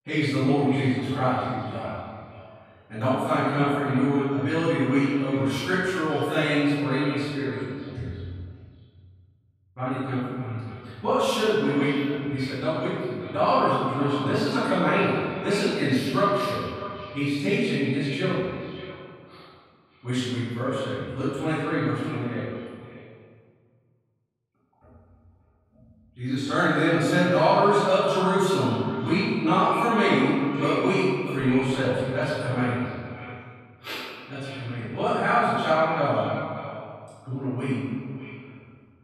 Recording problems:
room echo; strong; dies away in 1.6 s
off-mic speech; far
echo of what is said; noticeable; throughout; 590 ms later, 15 dB below the speech

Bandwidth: 14 kHz